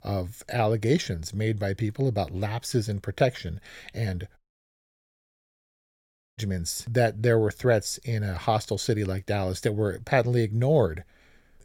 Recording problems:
audio cutting out; at 4.5 s for 2 s

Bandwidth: 16.5 kHz